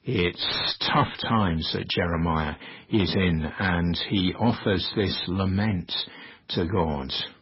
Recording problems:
garbled, watery; badly; nothing above 5.5 kHz
distortion; slight; 10 dB below the speech

